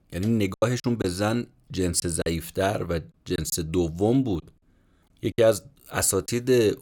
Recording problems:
choppy; very; at 0.5 s, from 2 to 3.5 s and from 4.5 to 6.5 s; 10% of the speech affected

